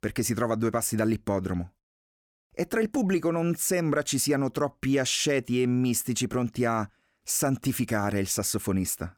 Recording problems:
none

